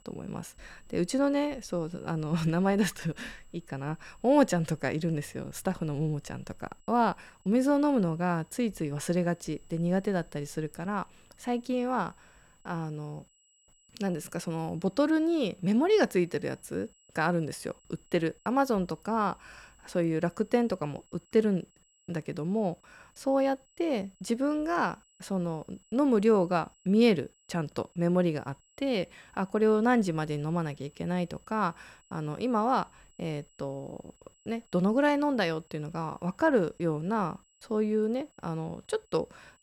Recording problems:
high-pitched whine; faint; throughout; 7.5 kHz, 35 dB below the speech

